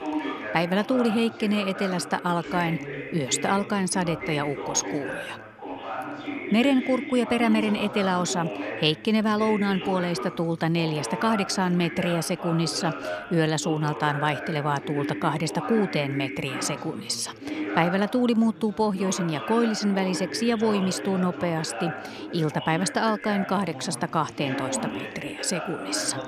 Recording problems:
background chatter; loud; throughout; 3 voices, 8 dB below the speech

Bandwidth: 14 kHz